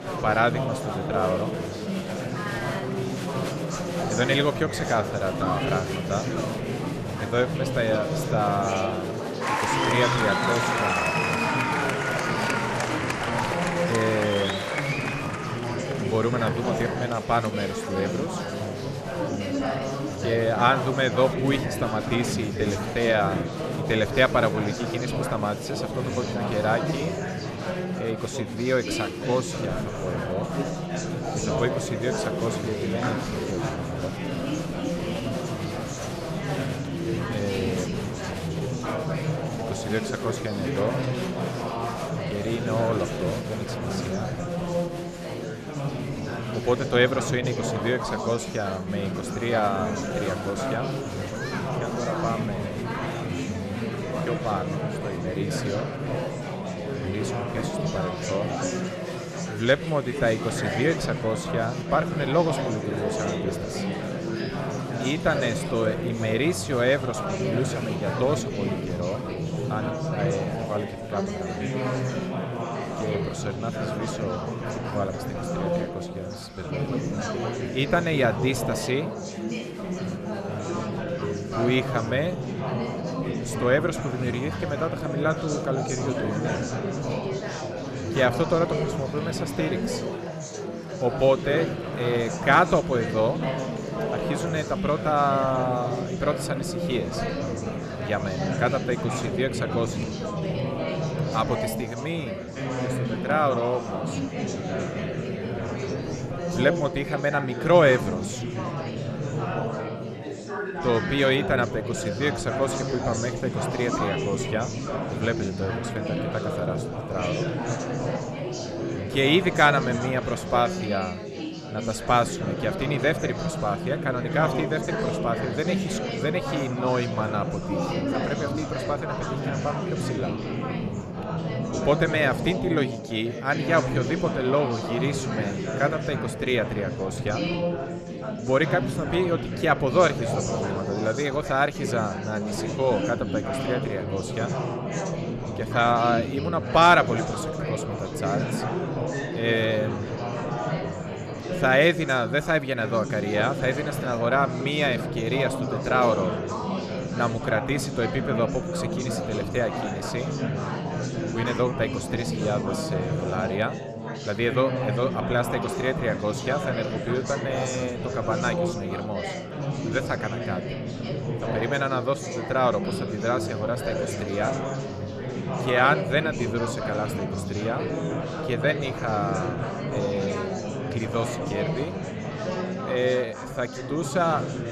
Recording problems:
chatter from many people; loud; throughout; 2 dB below the speech

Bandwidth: 13.5 kHz